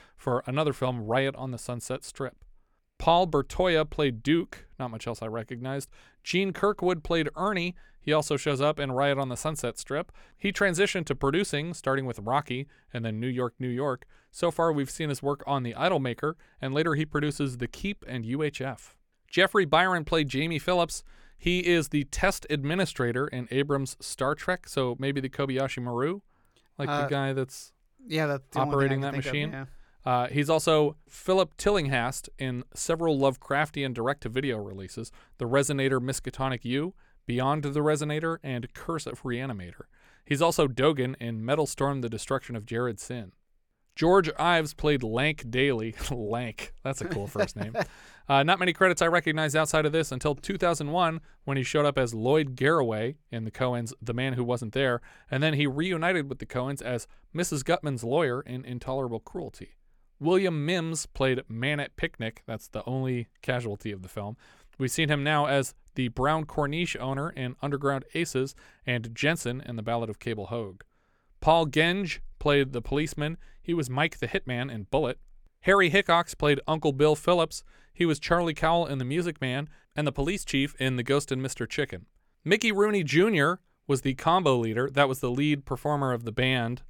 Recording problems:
none

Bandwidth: 17.5 kHz